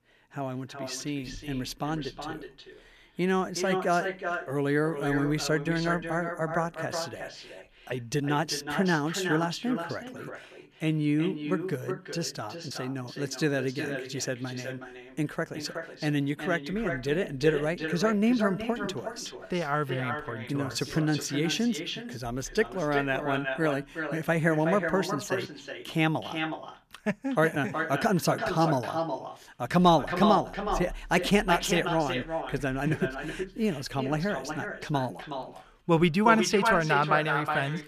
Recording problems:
echo of what is said; strong; throughout; 370 ms later, 6 dB below the speech

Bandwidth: 14.5 kHz